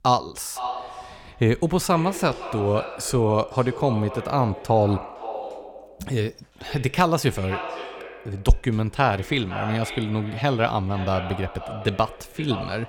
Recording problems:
echo of what is said; strong; throughout; 510 ms later, 10 dB below the speech

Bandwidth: 17.5 kHz